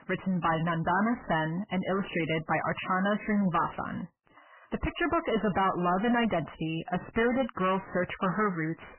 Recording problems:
distortion; heavy; 6 dB below the speech
garbled, watery; badly; nothing above 3 kHz

